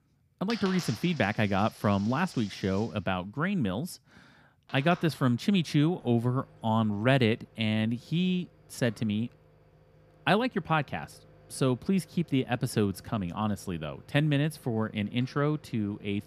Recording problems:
household noises; faint; throughout; 20 dB below the speech

